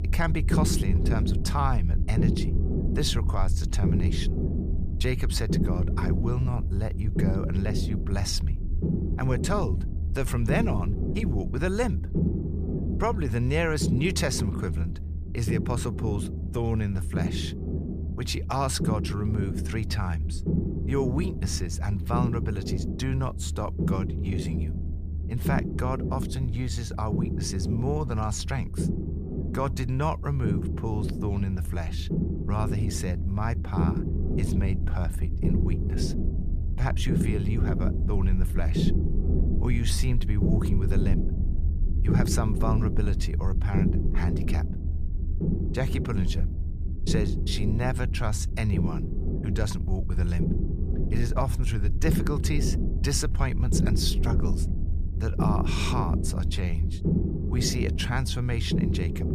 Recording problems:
low rumble; loud; throughout; 5 dB below the speech

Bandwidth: 14.5 kHz